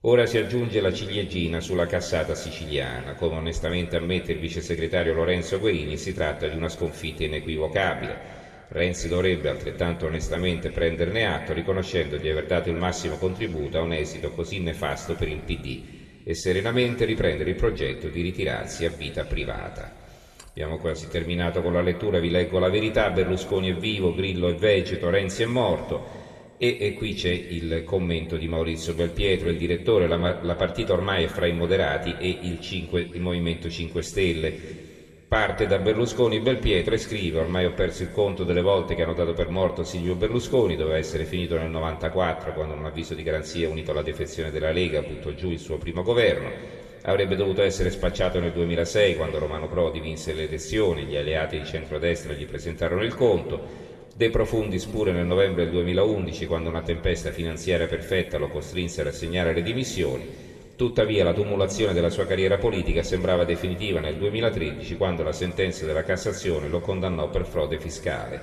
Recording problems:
room echo; noticeable; dies away in 2 s
off-mic speech; somewhat distant

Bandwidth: 13.5 kHz